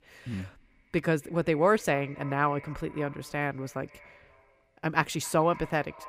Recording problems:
echo of what is said; faint; throughout; 270 ms later, 20 dB below the speech

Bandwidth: 15.5 kHz